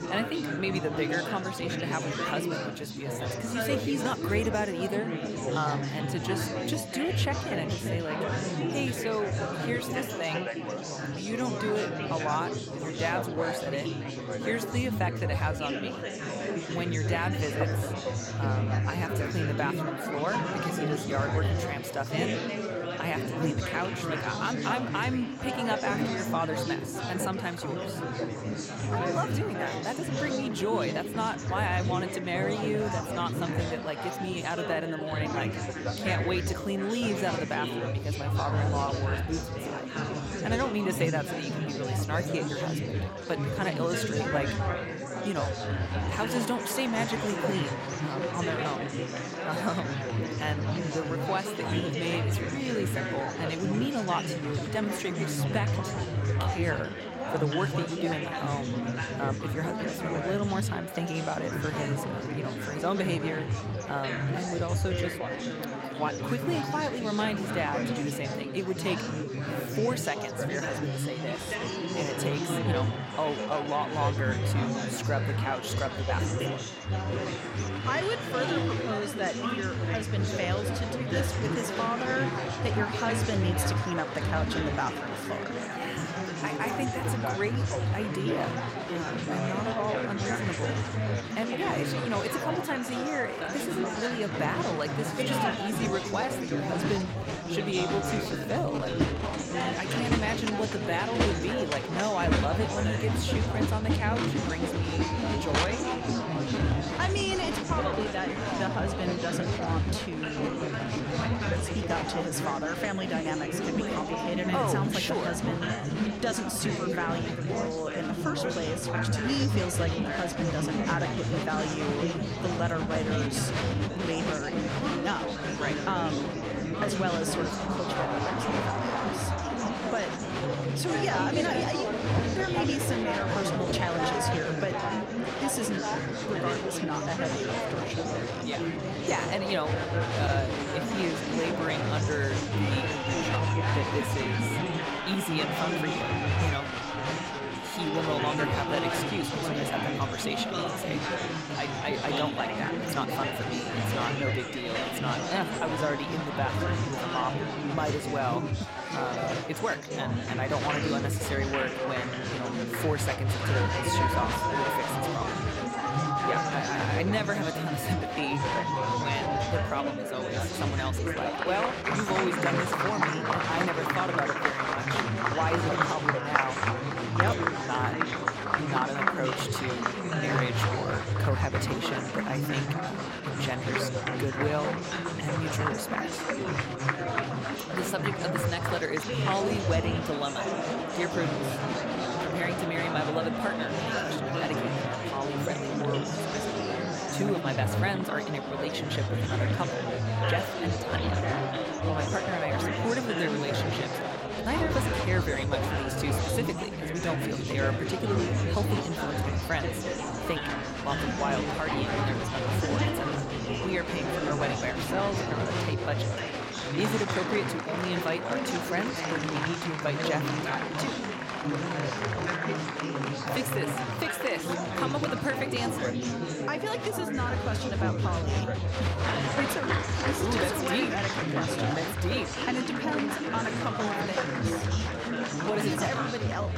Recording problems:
chatter from many people; very loud; throughout; 3 dB above the speech

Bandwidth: 16.5 kHz